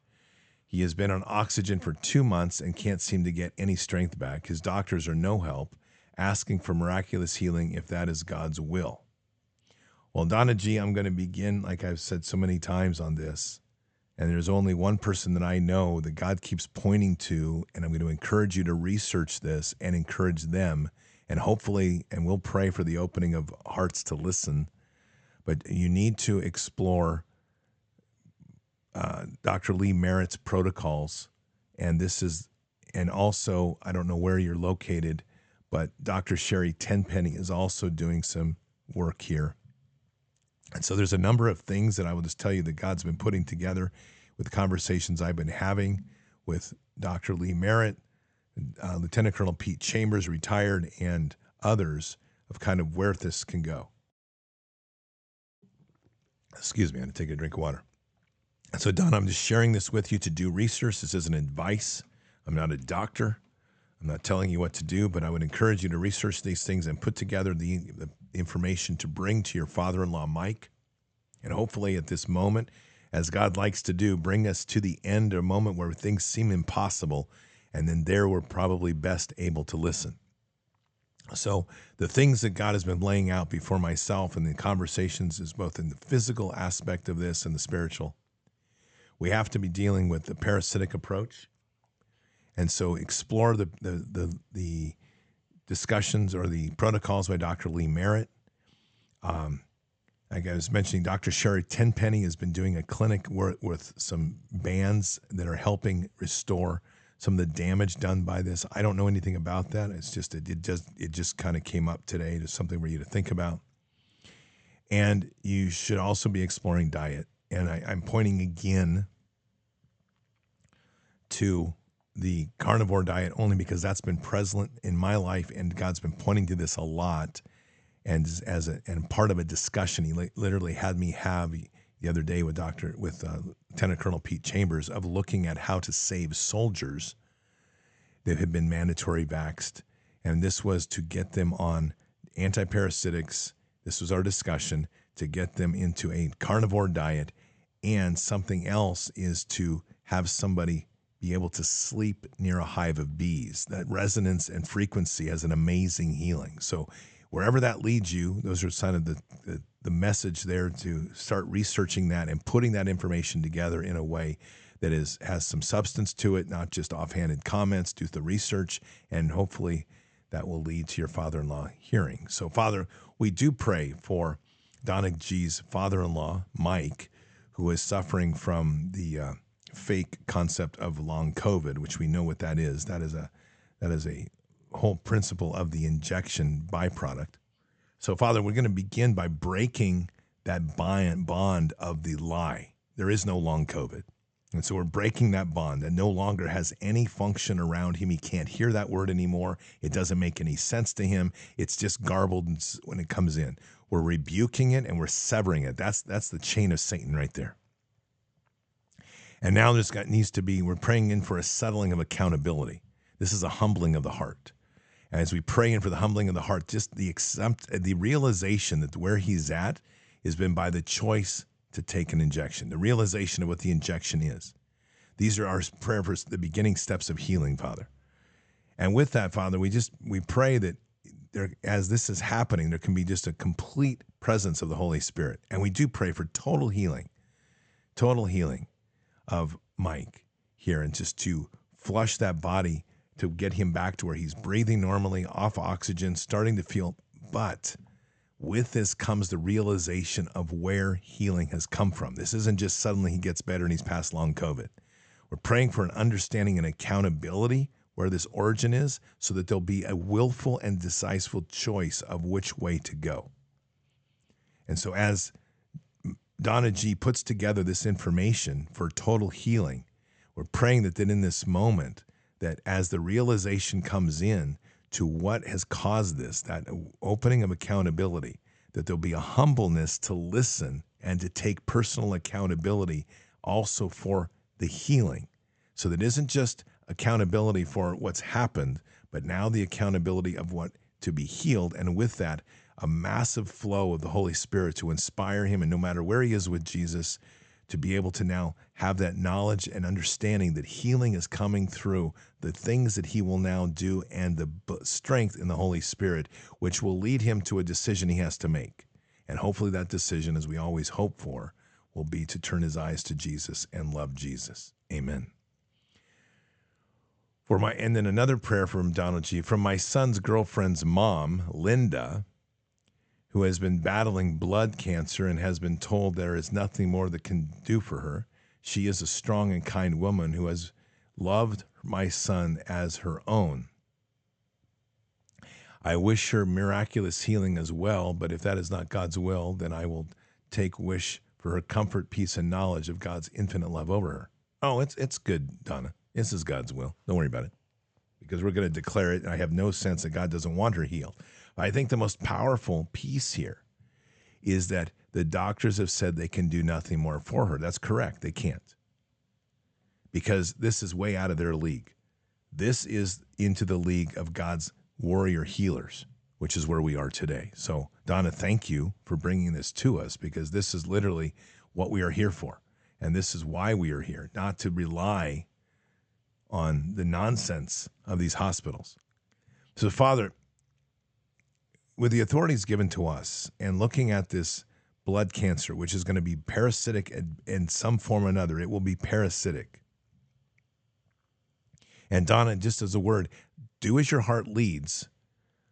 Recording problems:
high frequencies cut off; noticeable; nothing above 8 kHz

